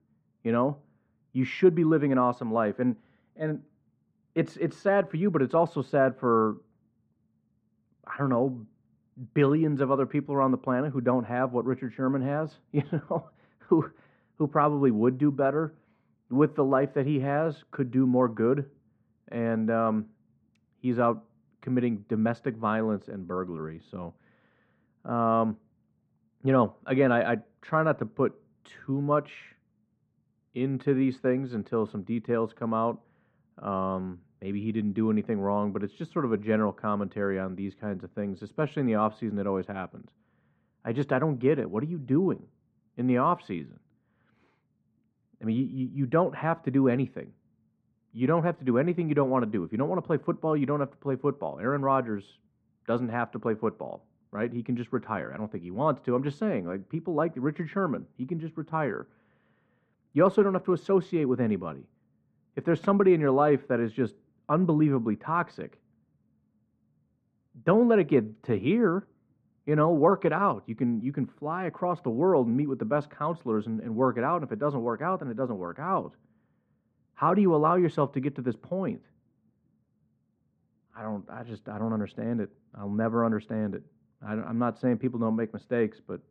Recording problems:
muffled; very; fading above 1.5 kHz

